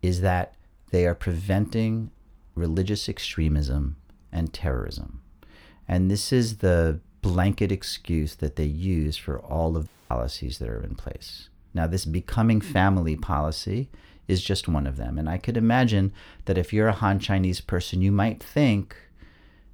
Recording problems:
audio cutting out; at 10 s

